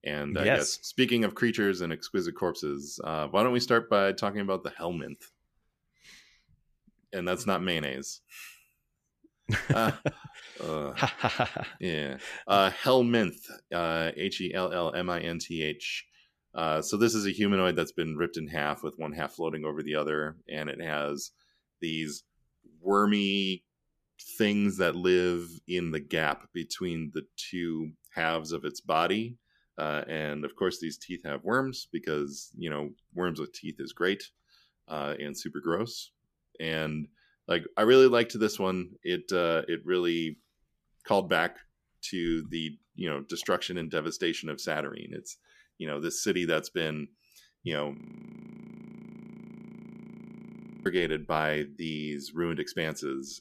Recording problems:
audio freezing; at 48 s for 3 s

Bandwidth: 14.5 kHz